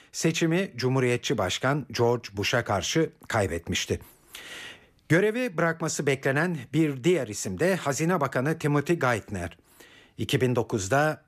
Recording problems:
none

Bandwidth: 14.5 kHz